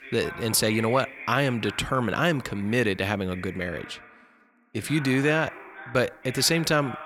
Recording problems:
voice in the background; noticeable; throughout; 15 dB below the speech

